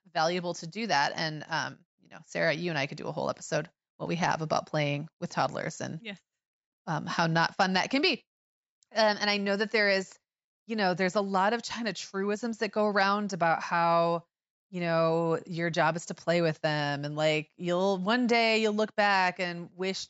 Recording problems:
high frequencies cut off; noticeable; nothing above 8 kHz

